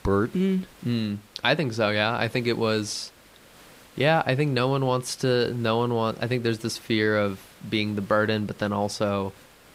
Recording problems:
hiss; faint; throughout; 25 dB below the speech

